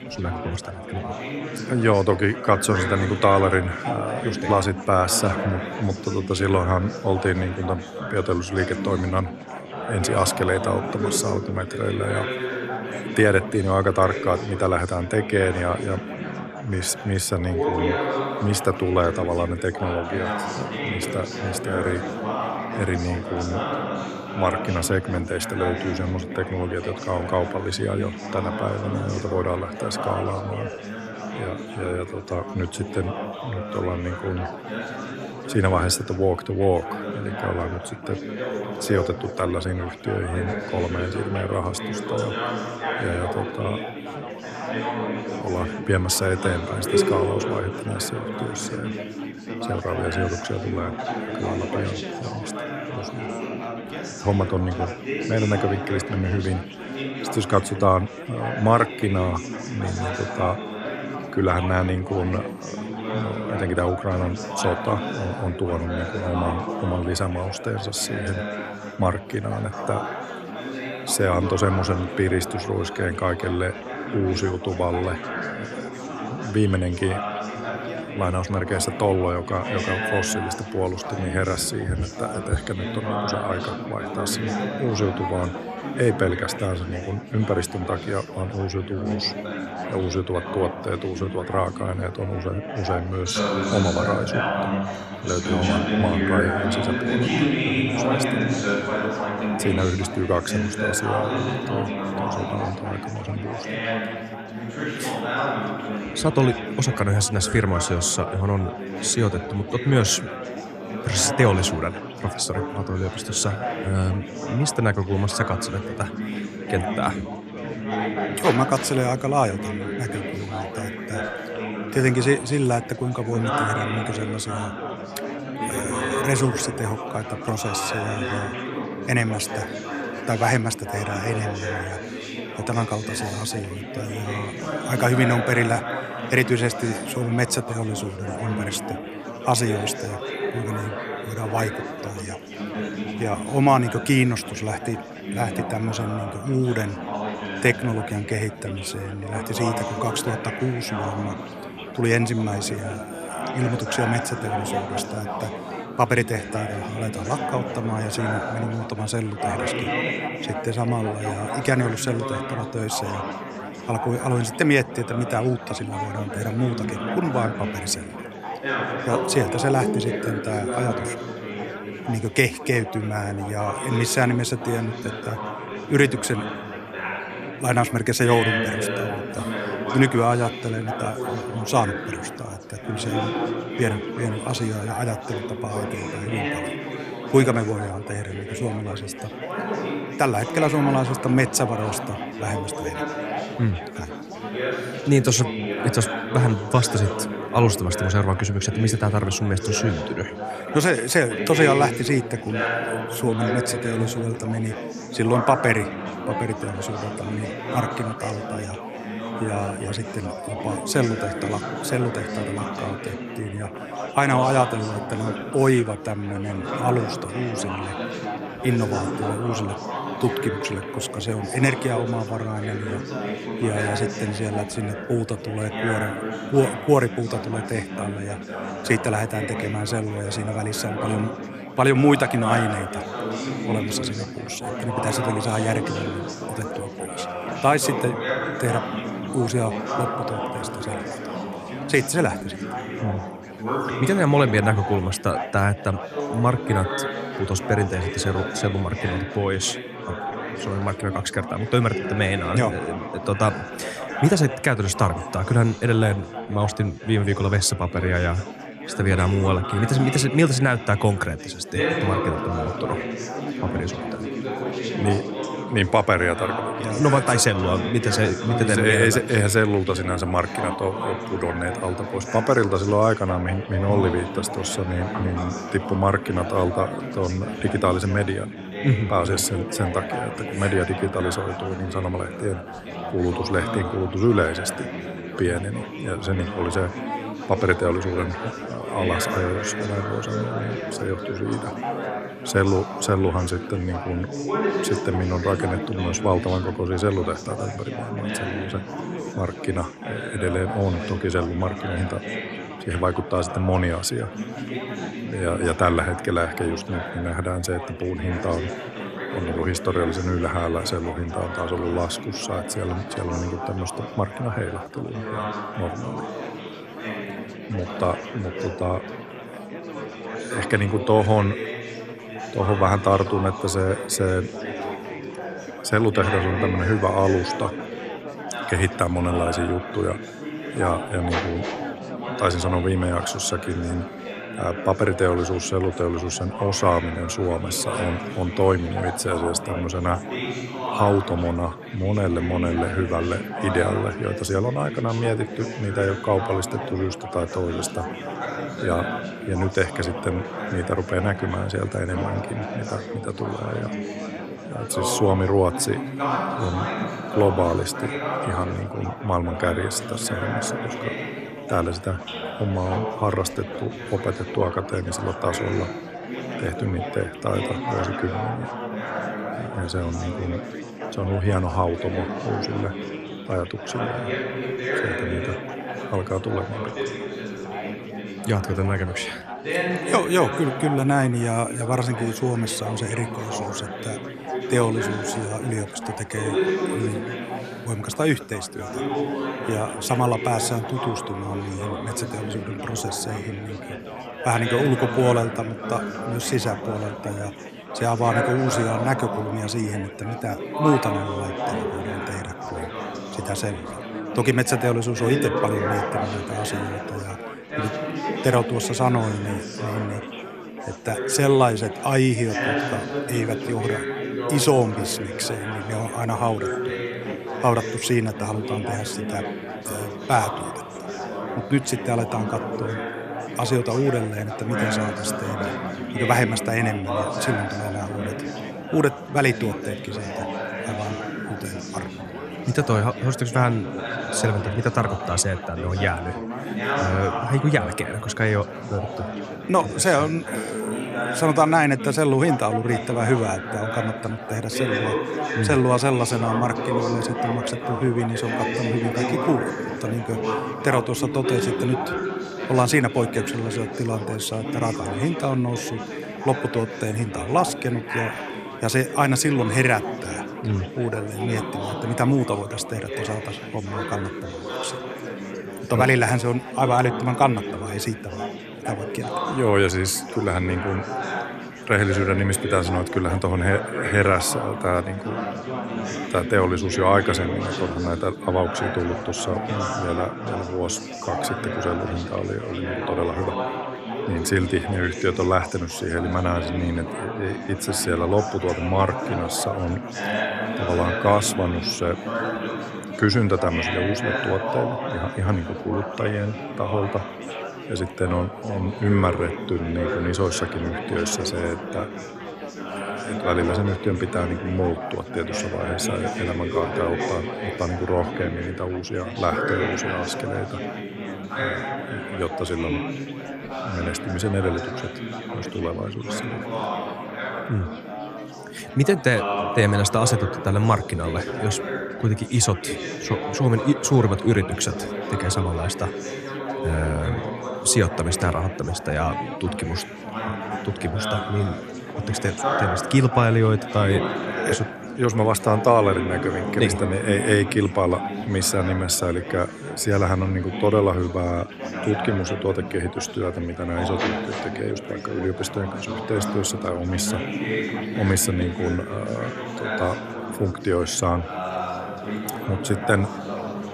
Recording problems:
chatter from many people; loud; throughout; 5 dB below the speech

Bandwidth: 14 kHz